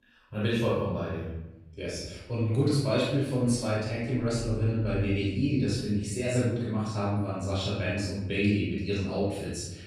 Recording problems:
room echo; strong; dies away in 0.9 s
off-mic speech; far

